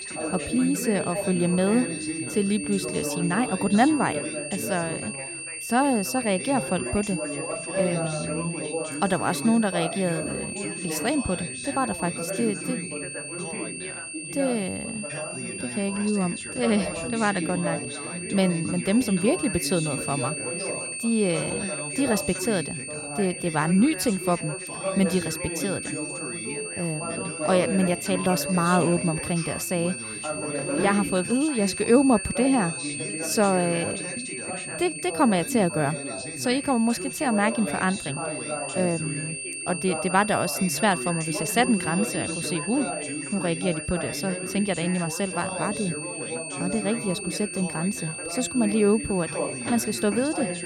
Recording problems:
high-pitched whine; loud; throughout; 2.5 kHz, 6 dB below the speech
background chatter; loud; throughout; 3 voices, 8 dB below the speech

